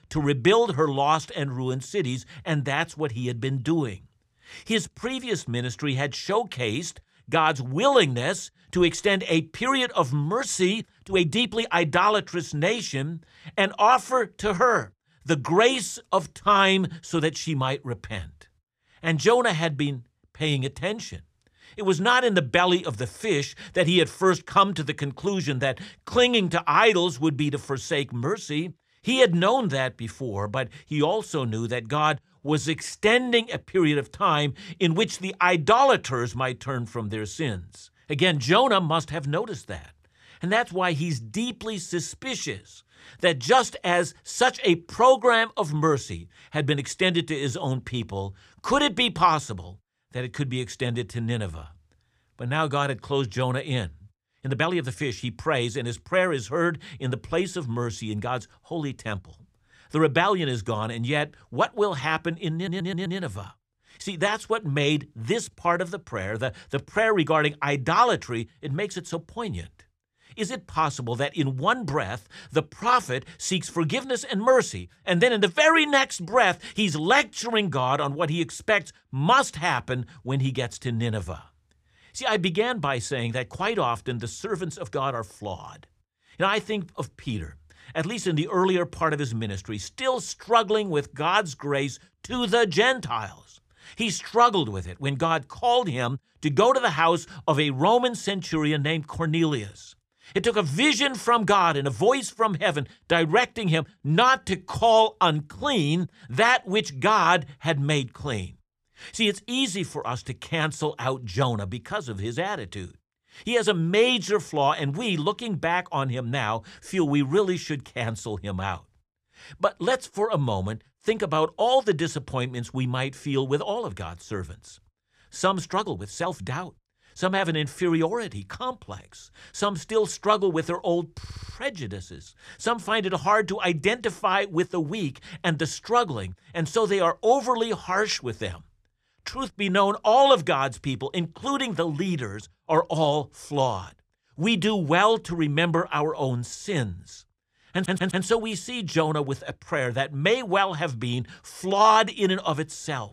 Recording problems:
uneven, jittery; strongly; from 11 s to 2:07
audio stuttering; at 1:03, at 2:11 and at 2:28

